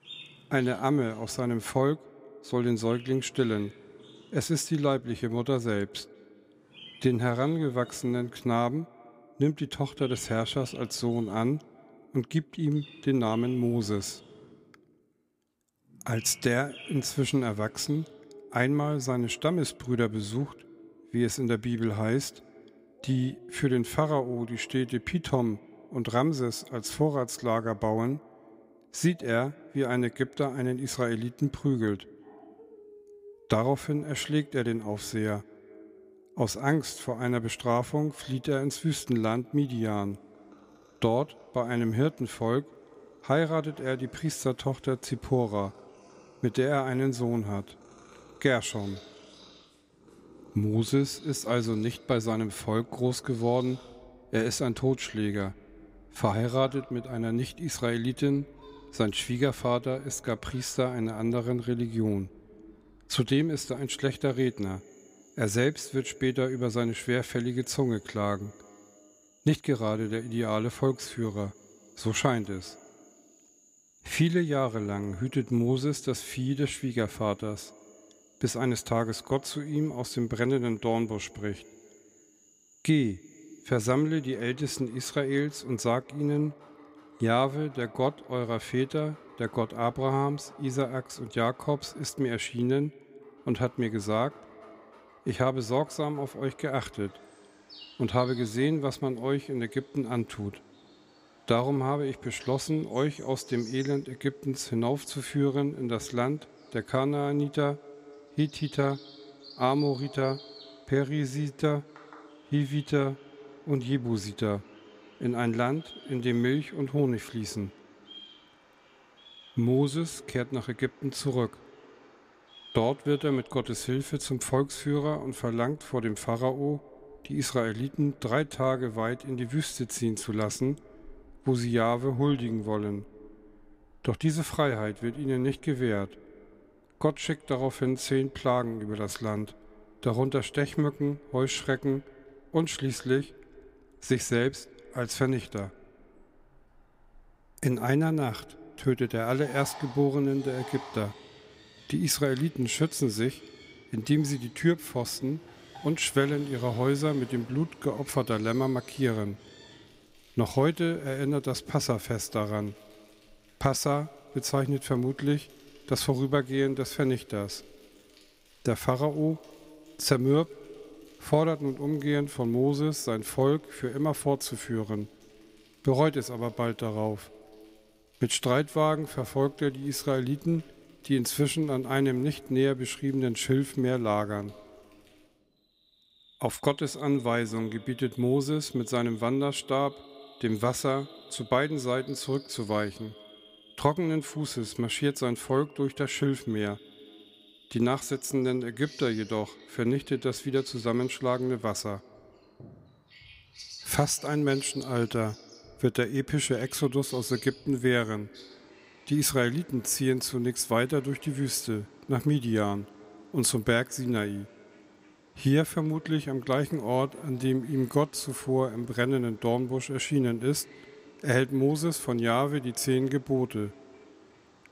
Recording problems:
echo of what is said; faint; throughout; 190 ms later, 25 dB below the speech
animal sounds; faint; throughout; 25 dB below the speech

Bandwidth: 15.5 kHz